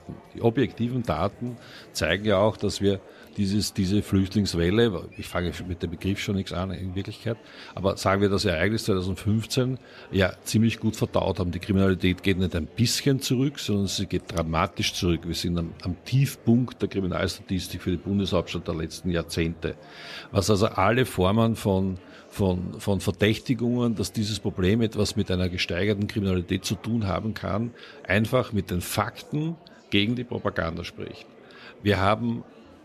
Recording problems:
murmuring crowd; faint; throughout; 25 dB below the speech

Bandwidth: 14 kHz